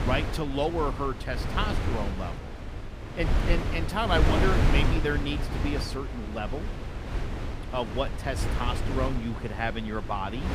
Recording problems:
wind noise on the microphone; heavy; 5 dB below the speech

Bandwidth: 15 kHz